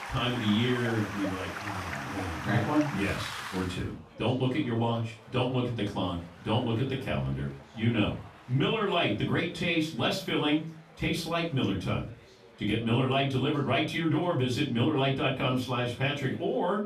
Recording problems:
off-mic speech; far
room echo; slight; dies away in 0.3 s
rain or running water; loud; until 3.5 s; 8 dB below the speech
chatter from many people; faint; throughout; 25 dB below the speech

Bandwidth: 14.5 kHz